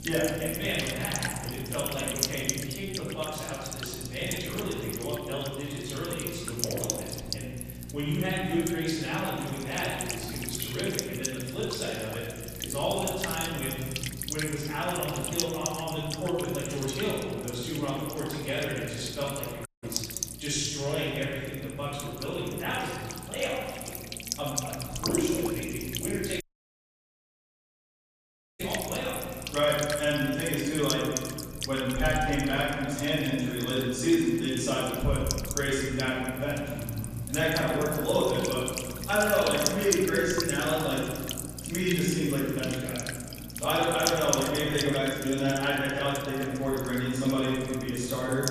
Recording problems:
room echo; strong; dies away in 1.7 s
off-mic speech; far
electrical hum; loud; throughout; 60 Hz, 7 dB below the speech
audio cutting out; at 20 s and at 26 s for 2 s

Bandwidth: 14.5 kHz